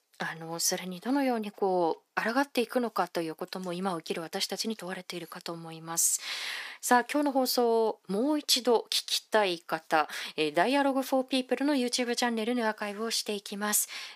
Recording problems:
thin; somewhat; fading below 400 Hz

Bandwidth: 15 kHz